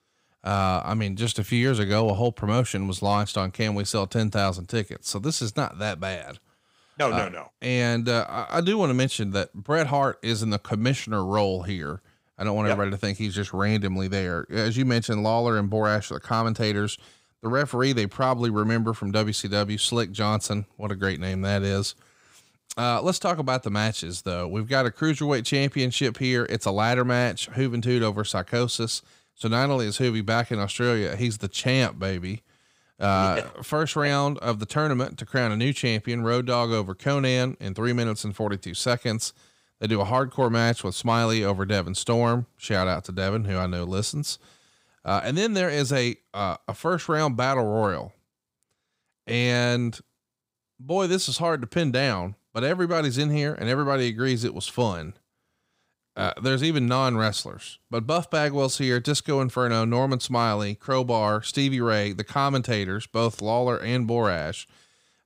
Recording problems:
none

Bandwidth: 15.5 kHz